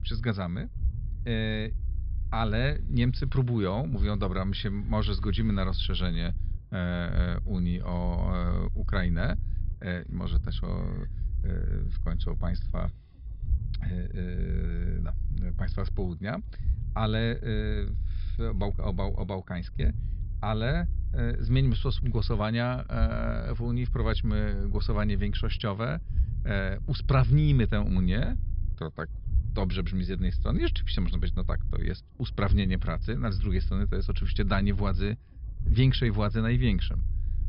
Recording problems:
high frequencies cut off; noticeable; nothing above 5.5 kHz
low rumble; noticeable; throughout; 15 dB below the speech

